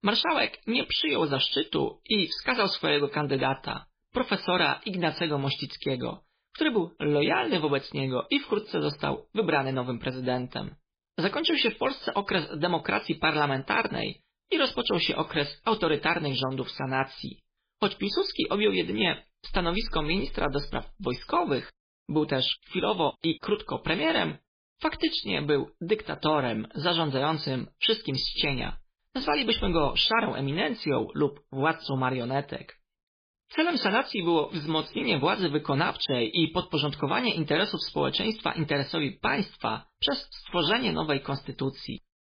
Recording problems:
garbled, watery; badly; nothing above 5 kHz

